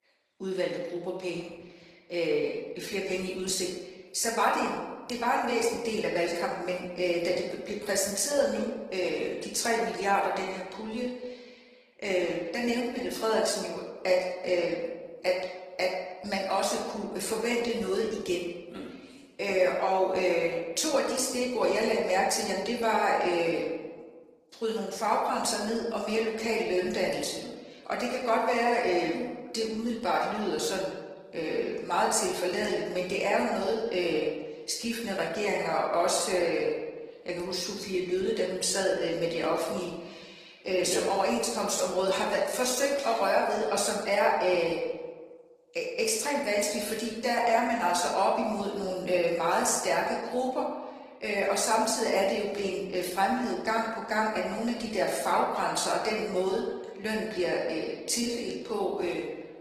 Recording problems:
off-mic speech; far
room echo; noticeable; dies away in 1 s
thin; somewhat; fading below 450 Hz
garbled, watery; slightly; nothing above 14.5 kHz

